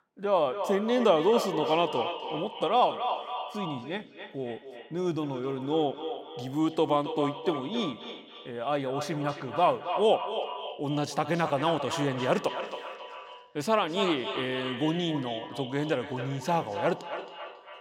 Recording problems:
echo of what is said; strong; throughout; 270 ms later, 8 dB below the speech

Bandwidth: 16 kHz